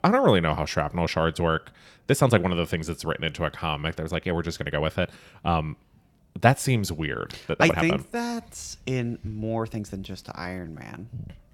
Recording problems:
uneven, jittery; strongly; from 2 to 11 s

